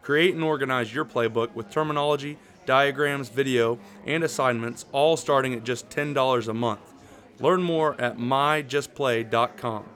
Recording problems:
chatter from many people; faint; throughout; 25 dB below the speech

